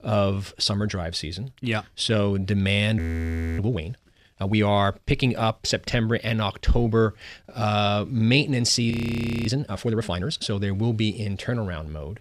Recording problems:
audio freezing; at 3 s for 0.5 s and at 9 s for 0.5 s

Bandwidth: 15 kHz